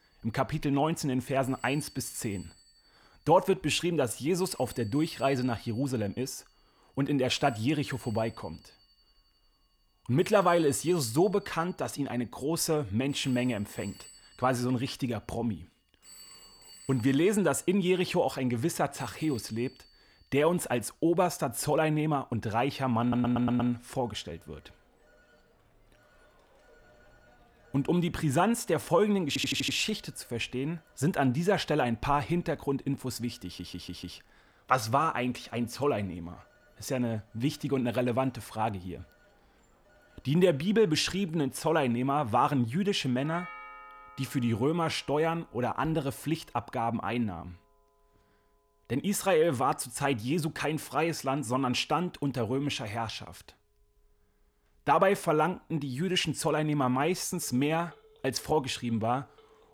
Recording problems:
alarms or sirens; faint; throughout; 25 dB below the speech
audio stuttering; at 23 s, at 29 s and at 33 s

